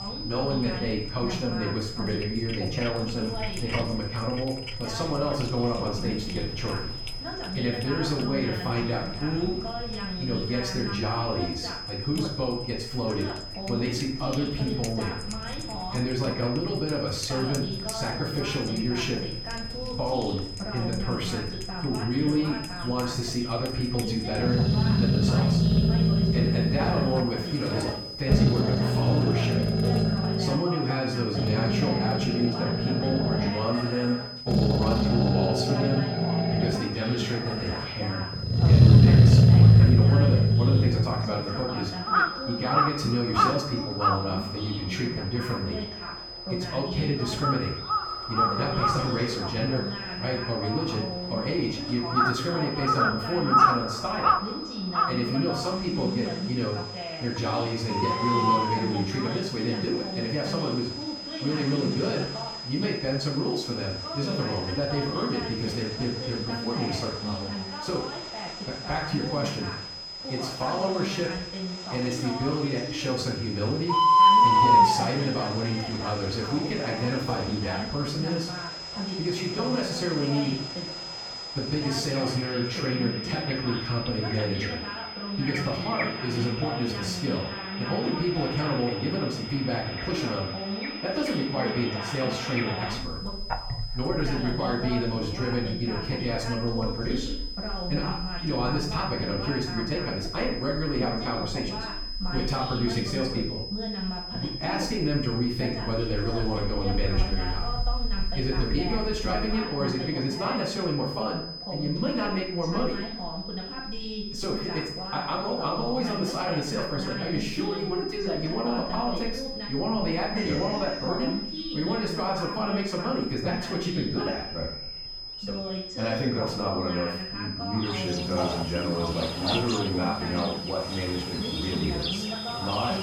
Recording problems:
off-mic speech; far
room echo; noticeable; dies away in 0.5 s
animal sounds; very loud; throughout; 5 dB above the speech
high-pitched whine; loud; throughout; 5 kHz, 6 dB below the speech
voice in the background; loud; throughout; 7 dB below the speech

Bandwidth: 18.5 kHz